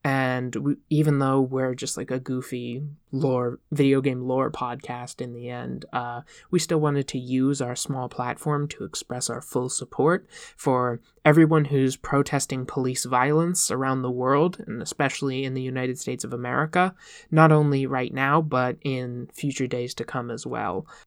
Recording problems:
none

